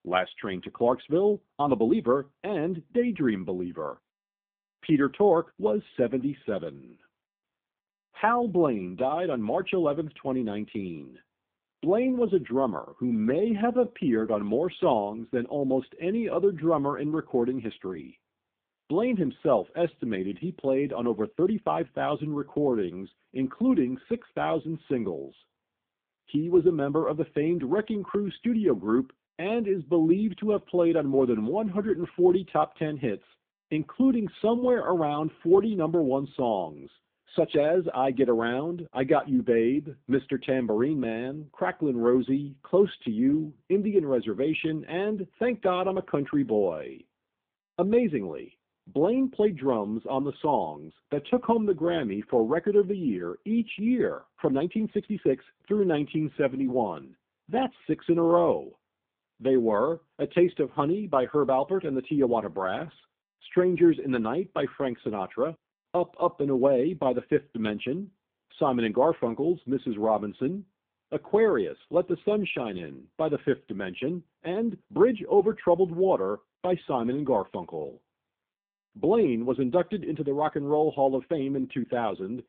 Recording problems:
phone-call audio; poor line
uneven, jittery; strongly; from 1.5 s to 1:21

